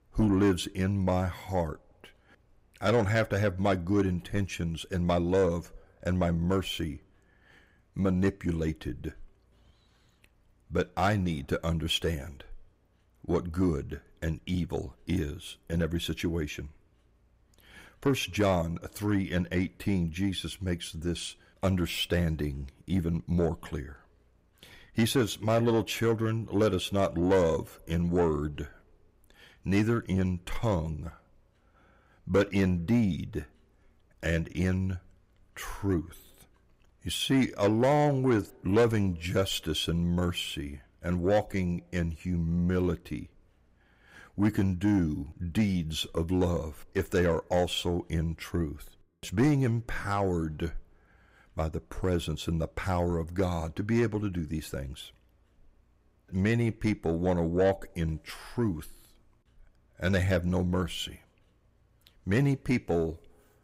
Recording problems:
distortion; slight; 10 dB below the speech

